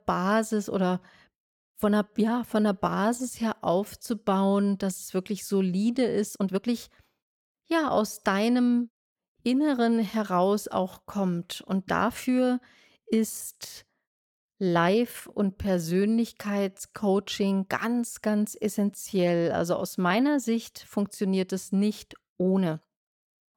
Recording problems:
uneven, jittery; strongly; from 2 to 23 s

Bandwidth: 17 kHz